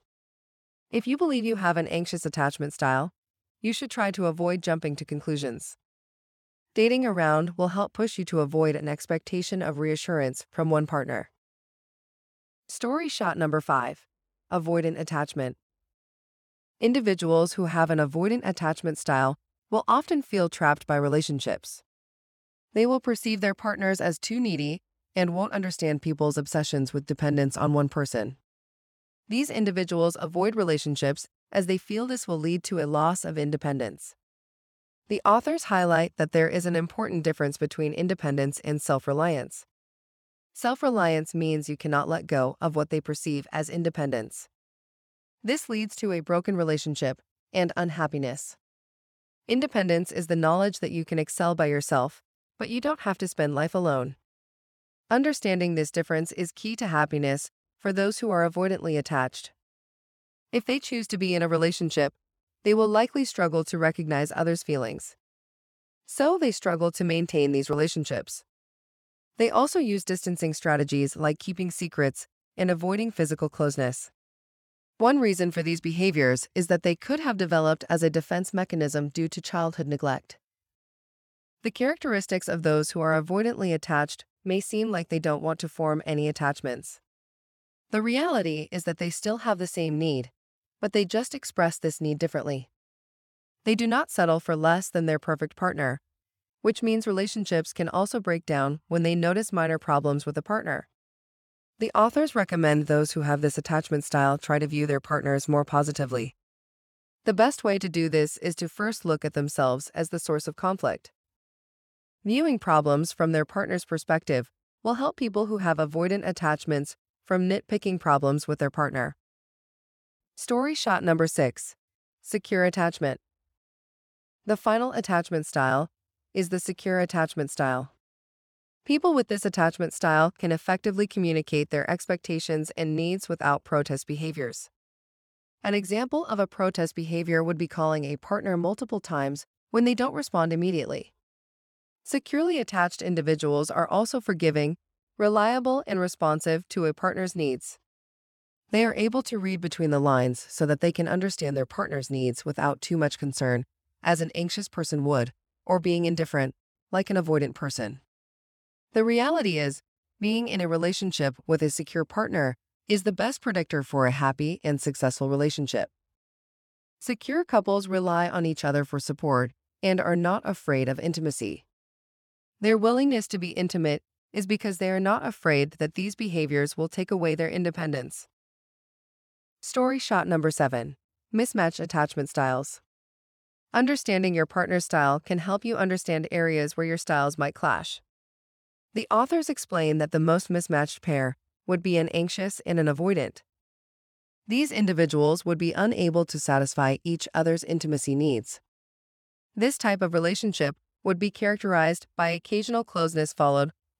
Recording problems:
none

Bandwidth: 18.5 kHz